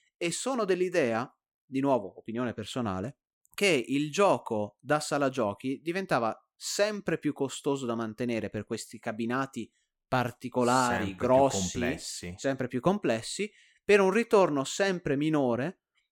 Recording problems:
none

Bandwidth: 17.5 kHz